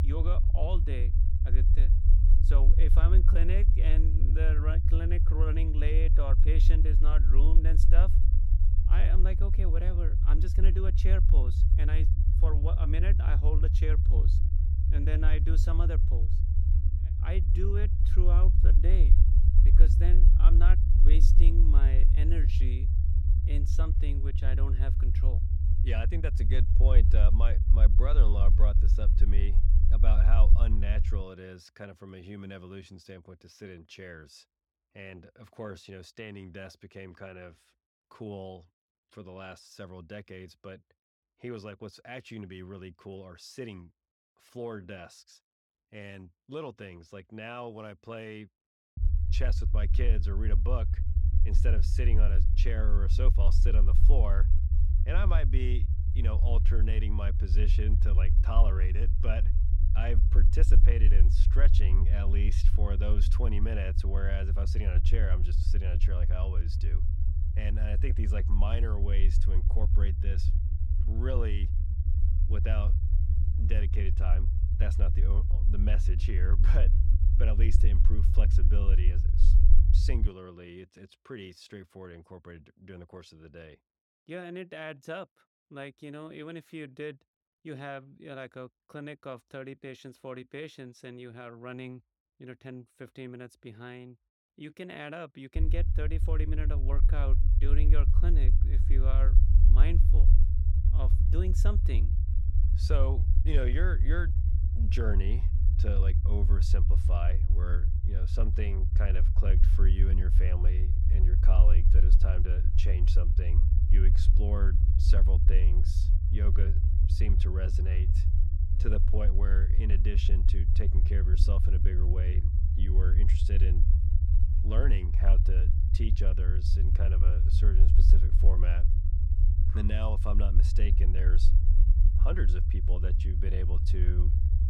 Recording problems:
low rumble; loud; until 31 s, from 49 s to 1:20 and from 1:36 on; 4 dB below the speech

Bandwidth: 17 kHz